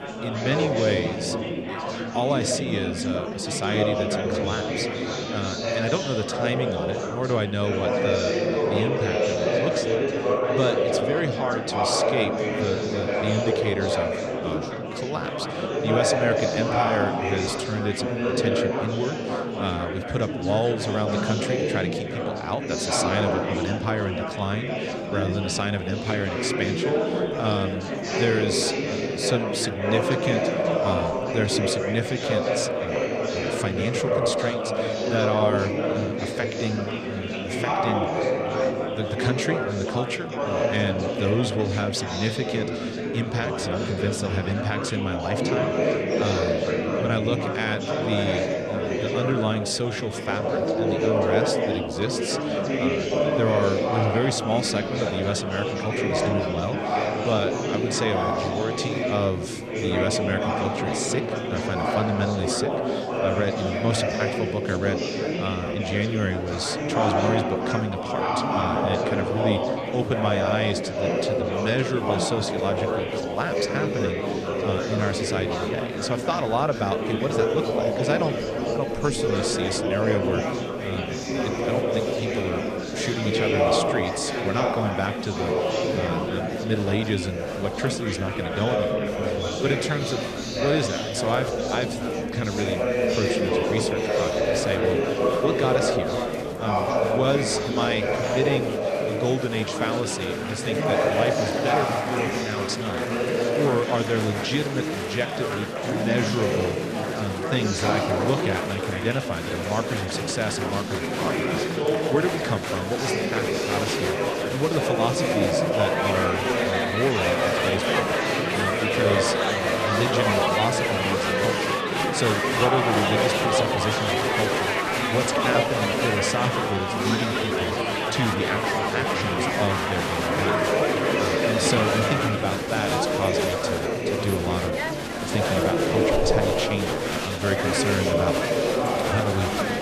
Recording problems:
murmuring crowd; very loud; throughout; 3 dB above the speech

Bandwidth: 14 kHz